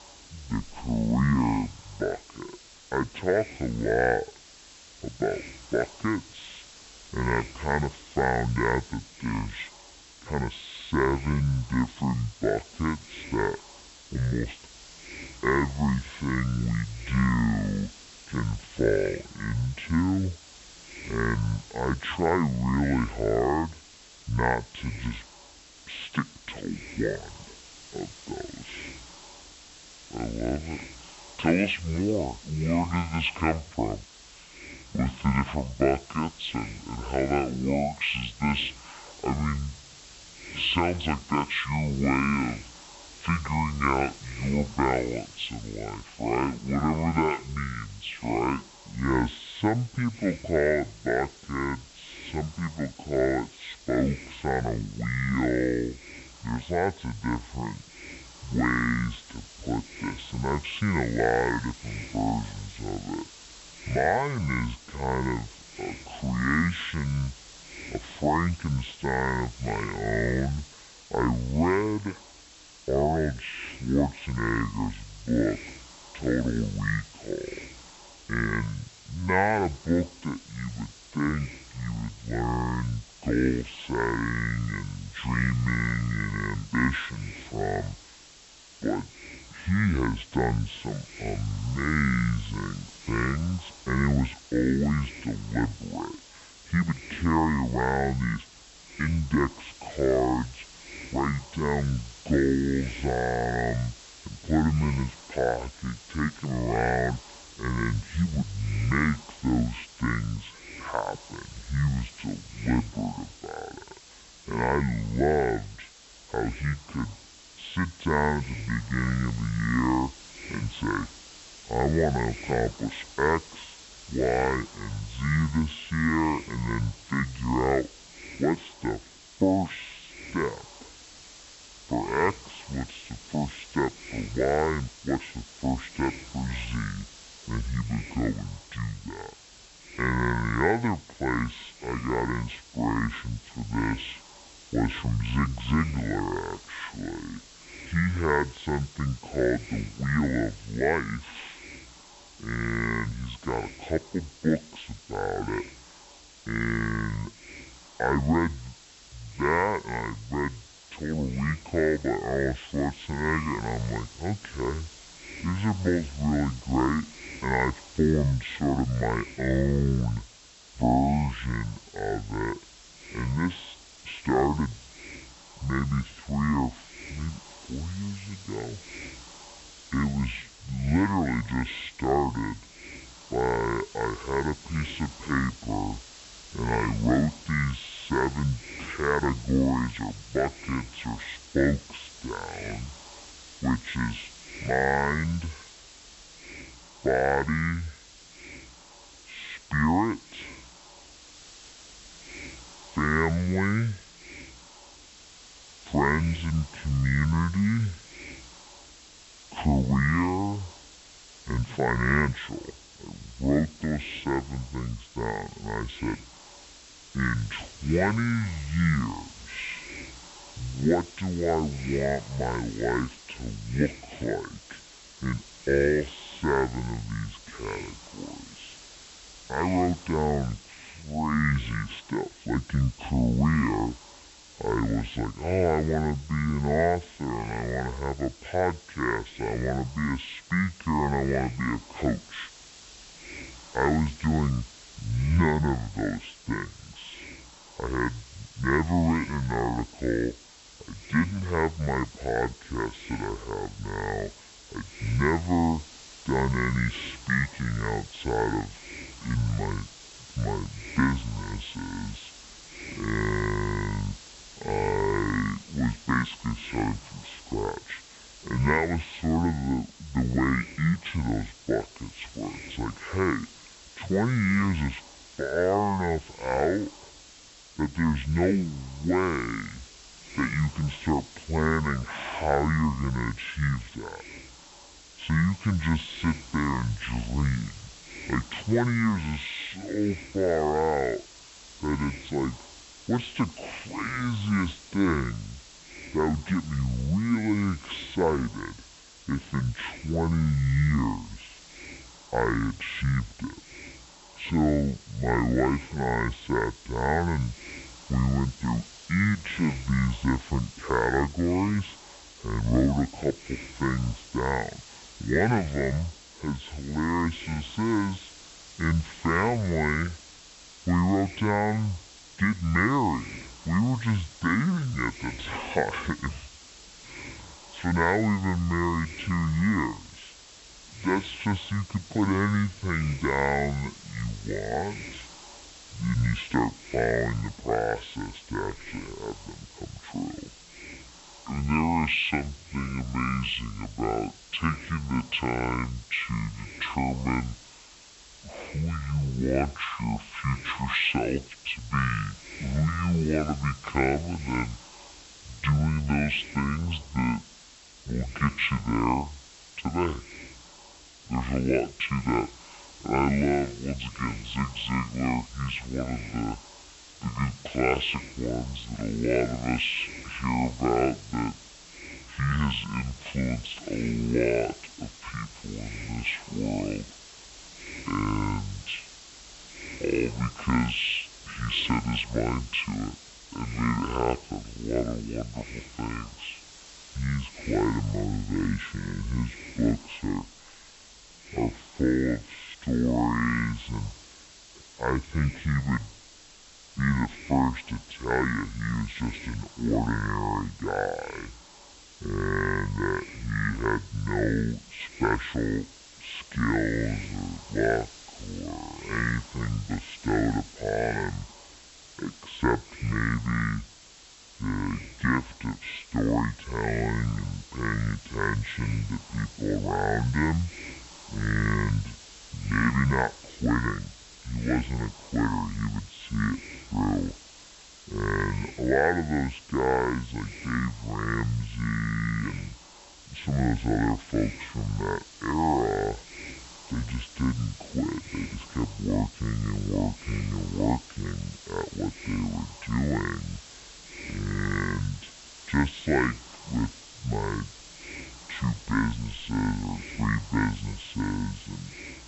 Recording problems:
high frequencies cut off; severe; nothing above 4 kHz
wrong speed and pitch; too slow and too low; 0.6 times normal speed
hiss; noticeable; throughout; 15 dB below the speech

